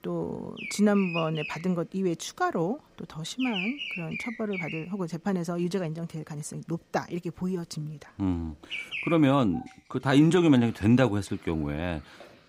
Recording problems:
animal sounds; loud; throughout; 8 dB below the speech

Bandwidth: 15.5 kHz